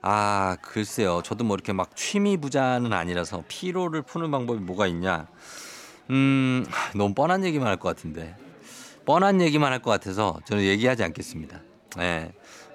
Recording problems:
chatter from many people; faint; throughout; 25 dB below the speech

